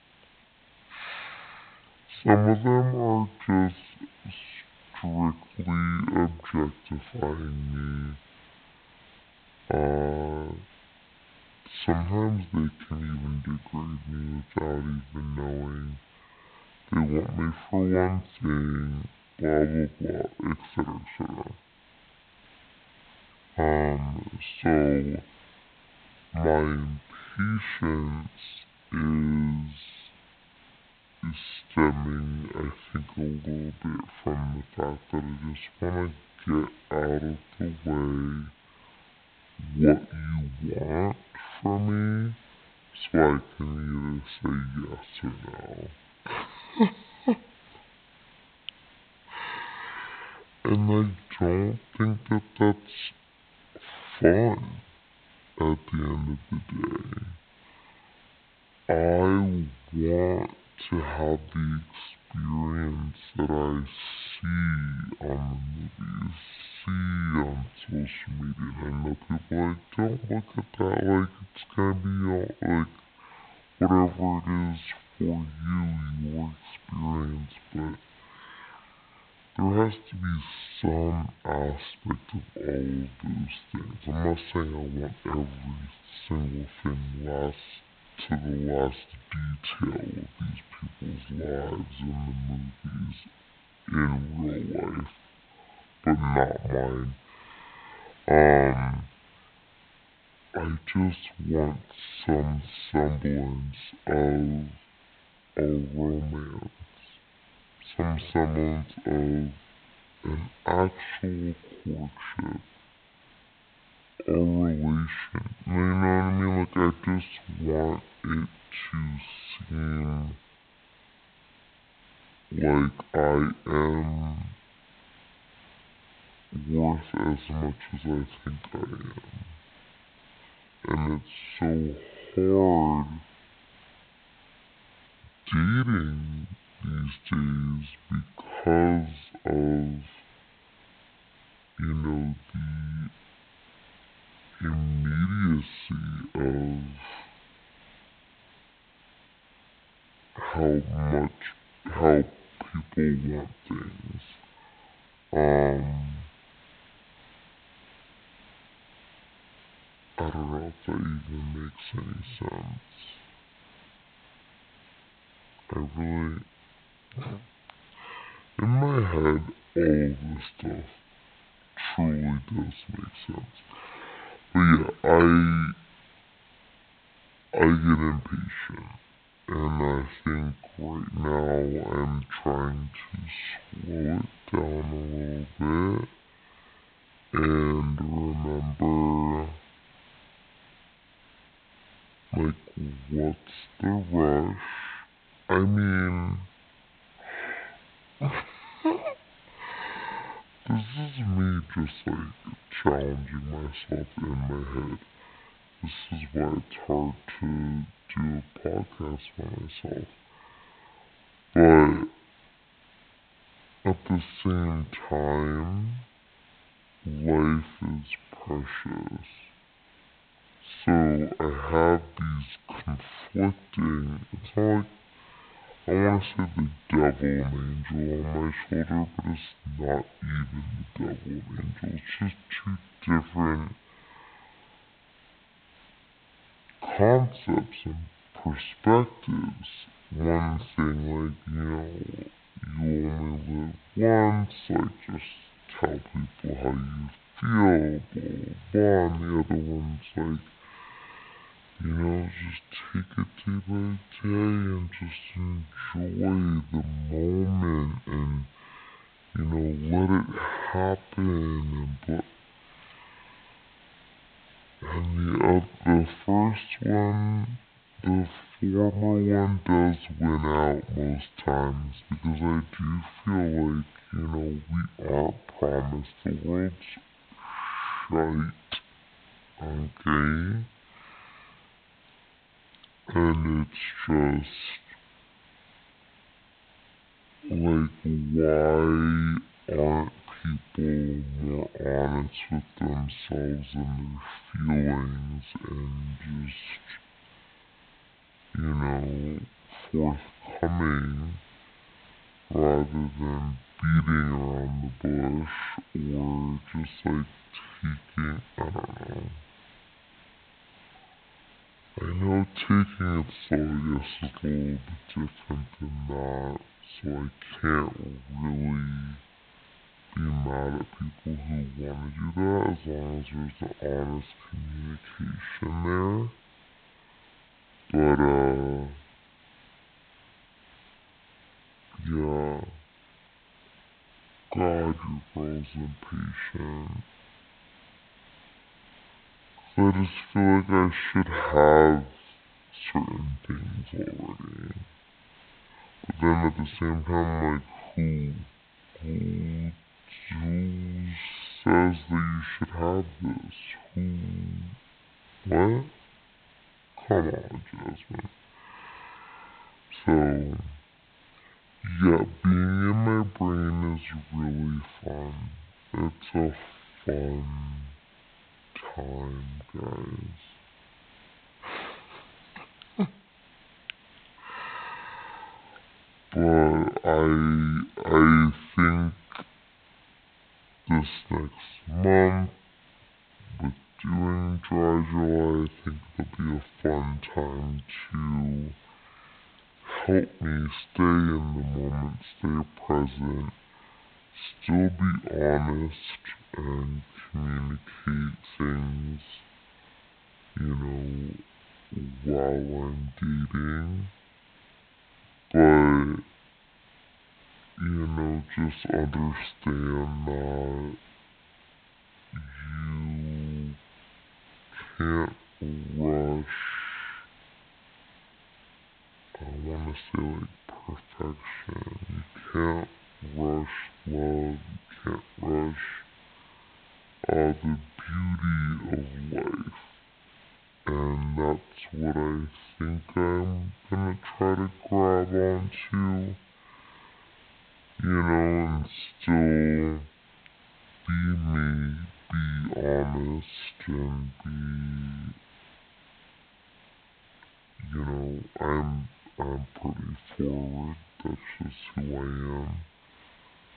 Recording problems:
high frequencies cut off; severe; nothing above 4 kHz
wrong speed and pitch; too slow and too low; 0.5 times normal speed
hiss; faint; throughout; 25 dB below the speech

